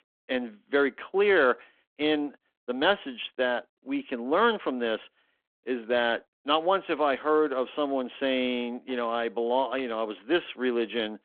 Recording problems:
phone-call audio

